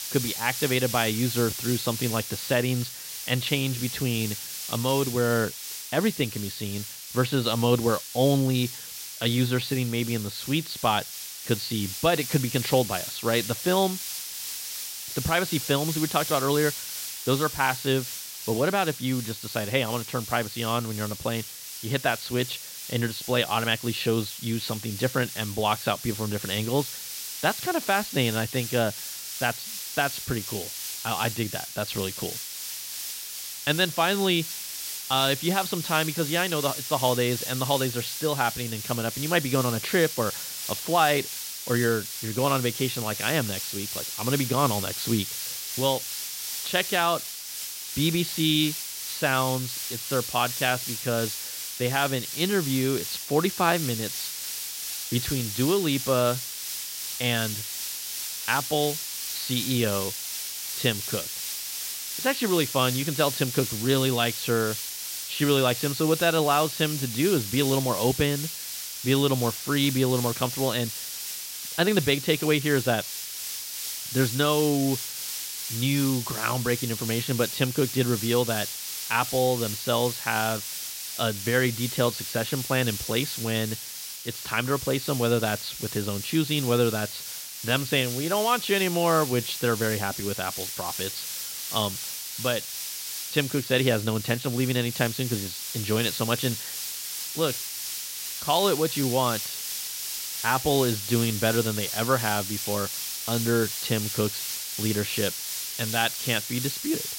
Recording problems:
high frequencies cut off; severe; nothing above 5 kHz
hiss; loud; throughout; 5 dB below the speech

